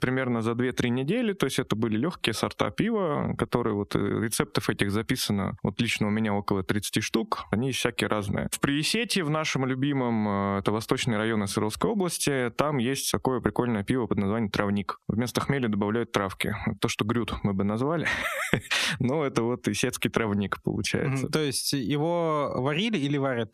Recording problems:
squashed, flat; heavily

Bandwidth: 14.5 kHz